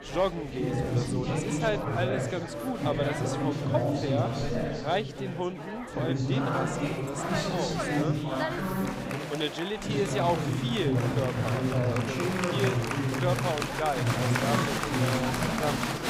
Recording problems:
chatter from many people; very loud; throughout; 4 dB above the speech

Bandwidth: 15.5 kHz